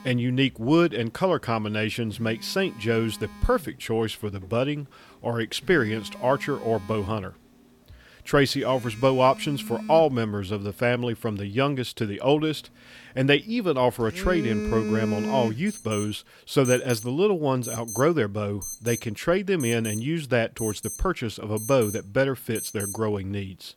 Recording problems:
alarms or sirens; noticeable; throughout; 10 dB below the speech

